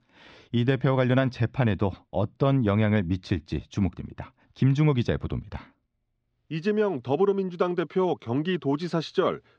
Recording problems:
muffled; very slightly; fading above 4 kHz

